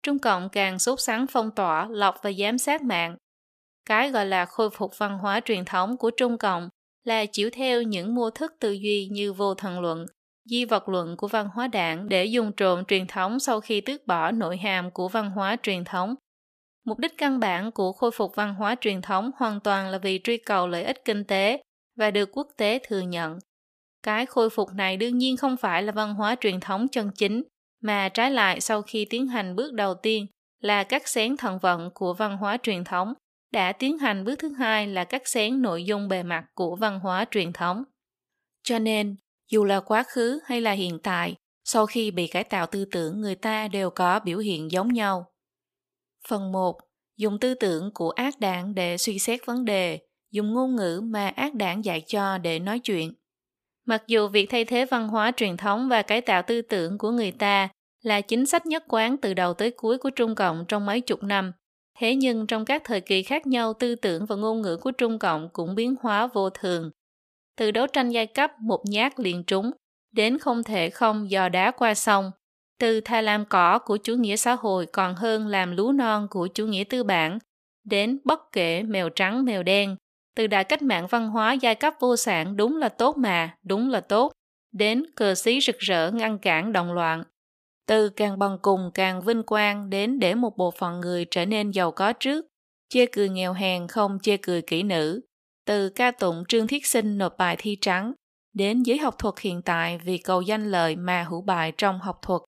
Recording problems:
thin; very slightly; fading below 500 Hz

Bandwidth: 14.5 kHz